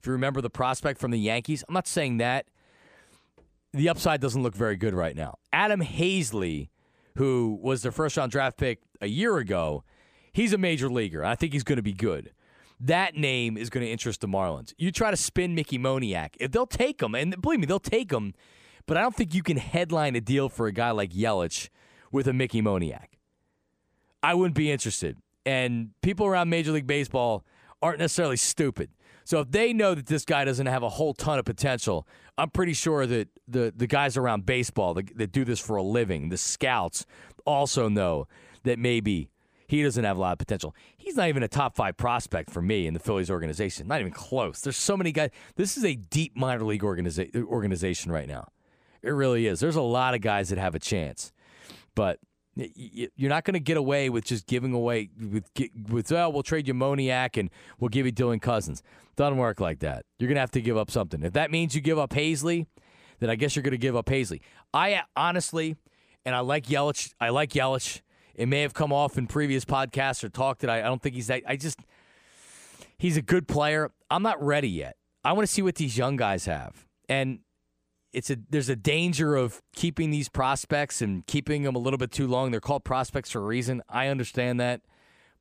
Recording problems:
none

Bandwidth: 15 kHz